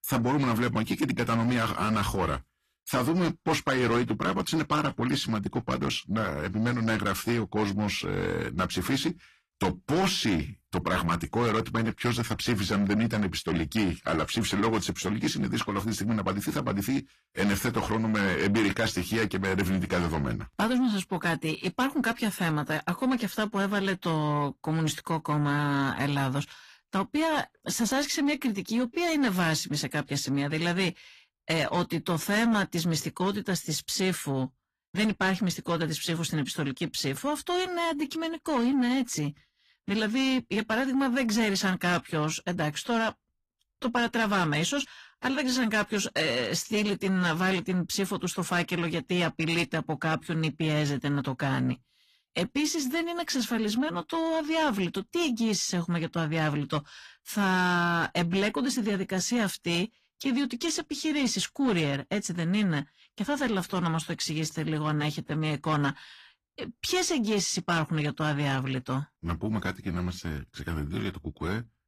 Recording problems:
distortion; slight; 10 dB below the speech
garbled, watery; slightly; nothing above 14.5 kHz

